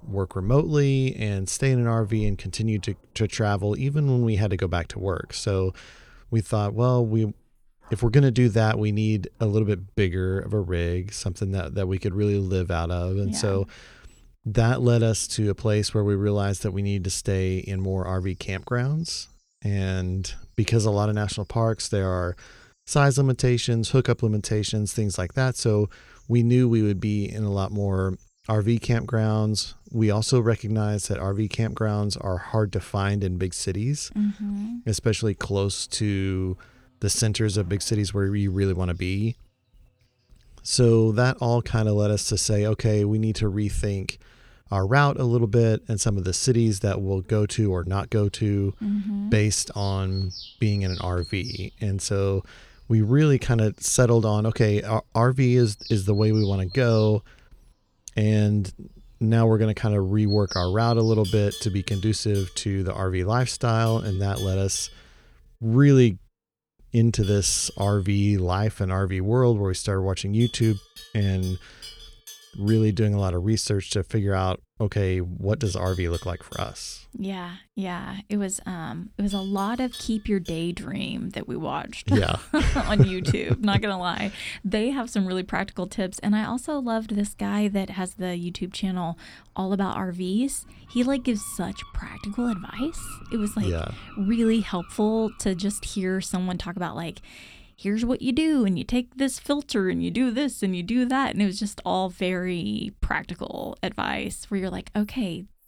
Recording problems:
animal sounds; noticeable; throughout; 20 dB below the speech

